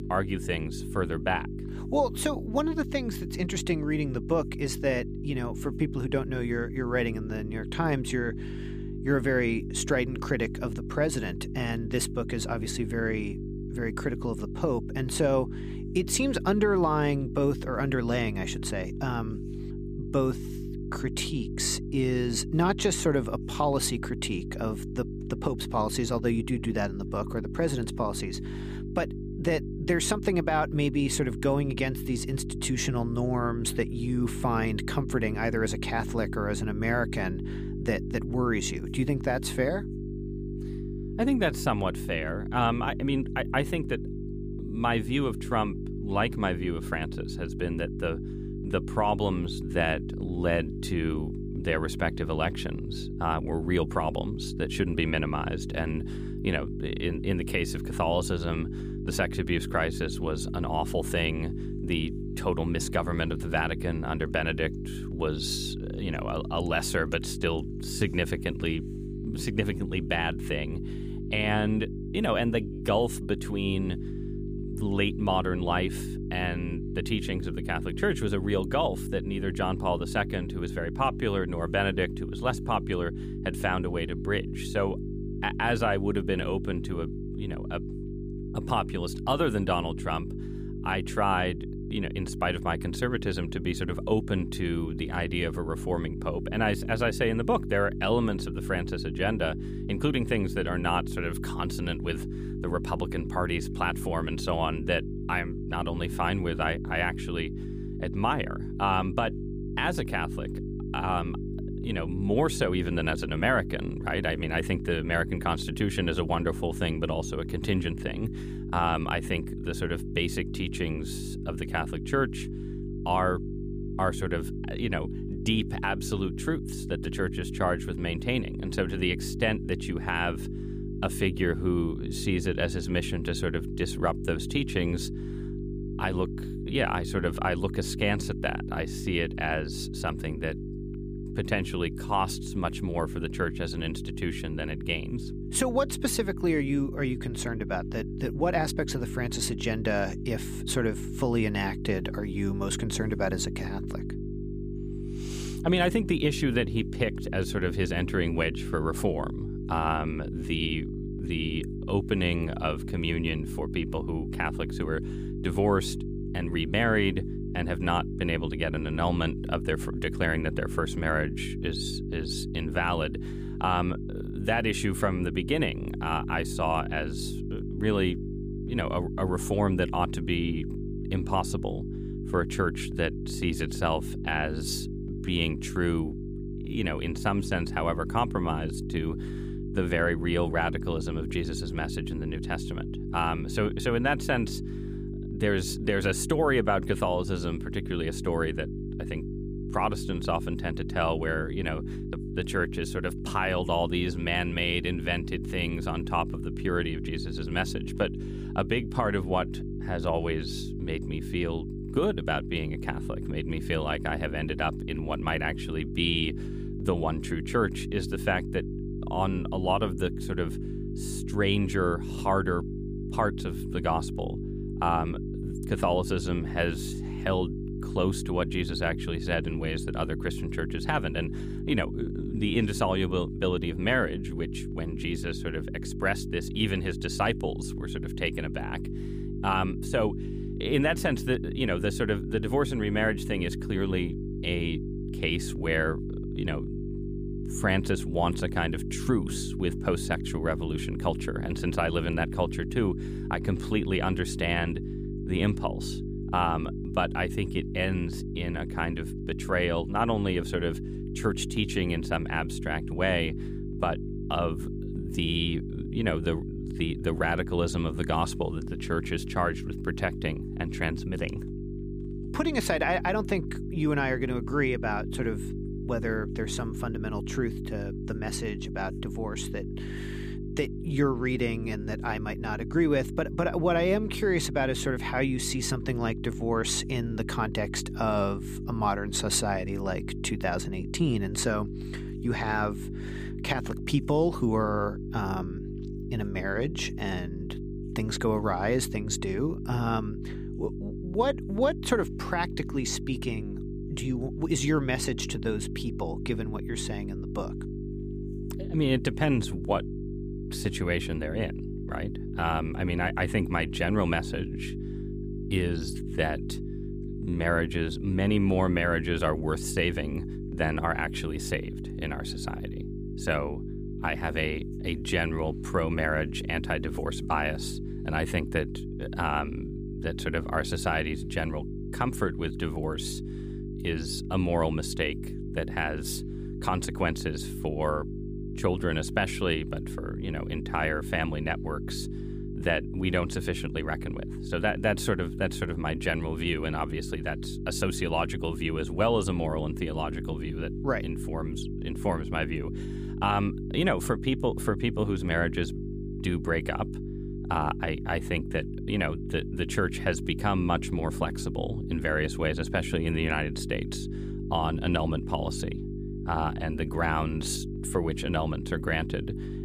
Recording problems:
electrical hum; noticeable; throughout; 50 Hz, 10 dB below the speech

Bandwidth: 15 kHz